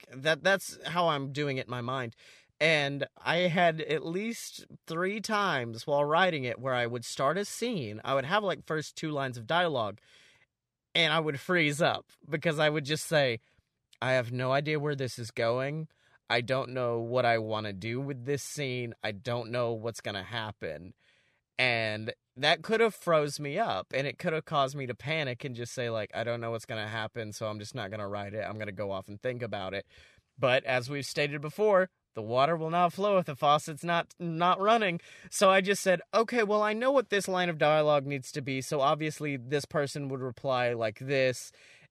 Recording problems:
none

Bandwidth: 14.5 kHz